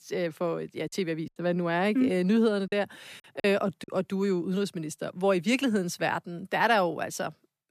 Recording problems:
choppy; very; from 1.5 to 4 s; 8% of the speech affected

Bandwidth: 14.5 kHz